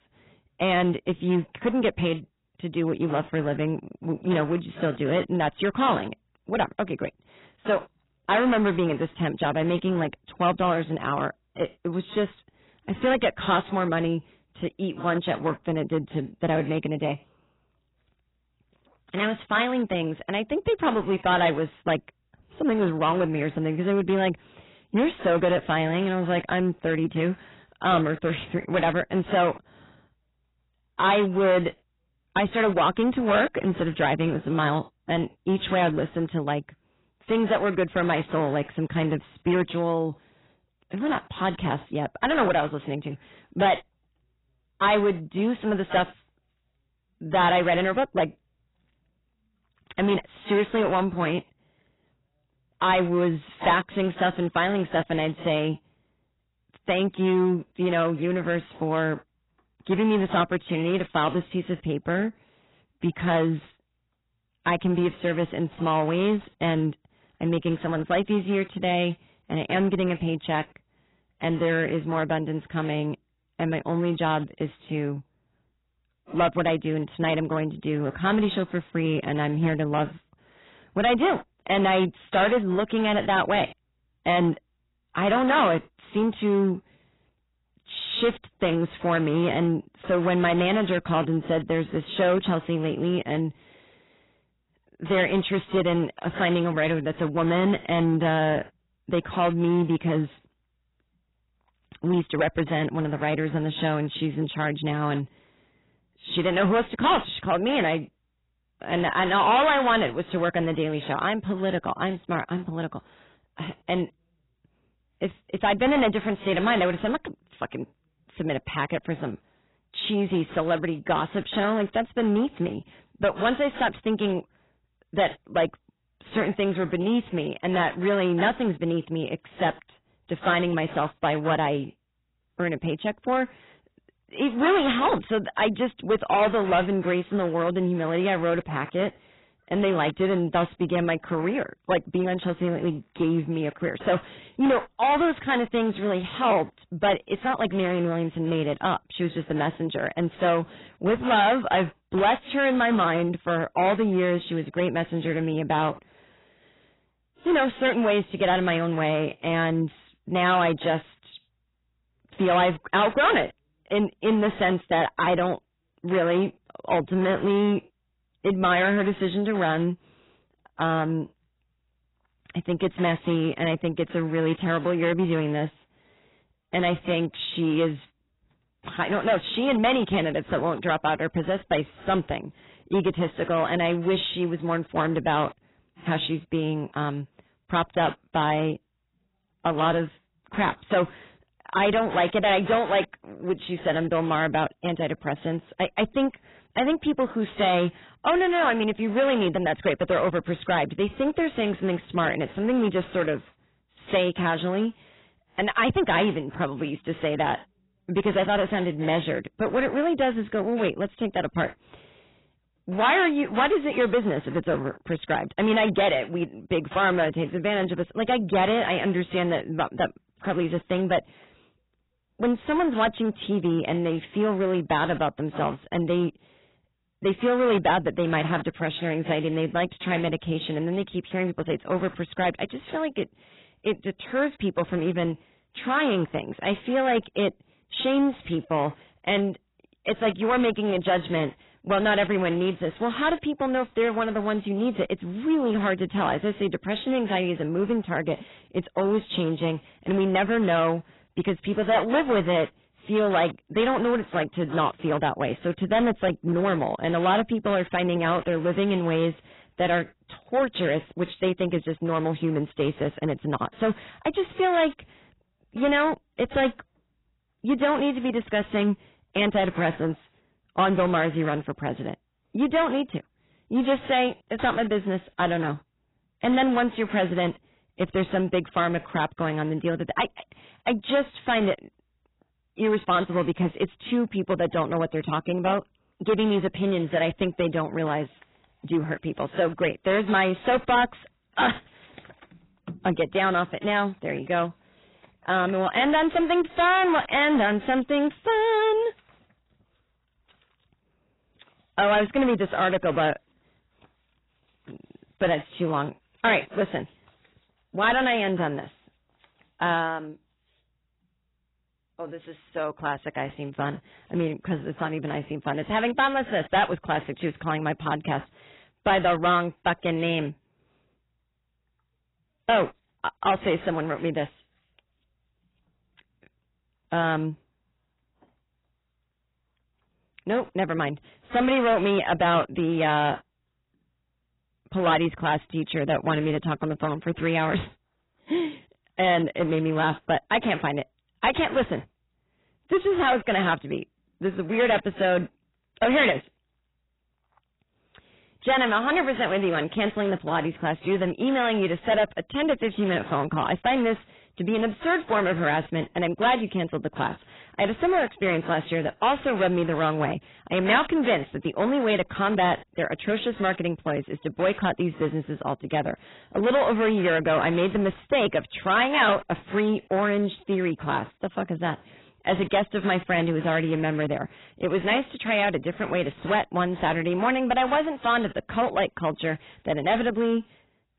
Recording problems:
distortion; heavy; 6% of the sound clipped
garbled, watery; badly; nothing above 4 kHz

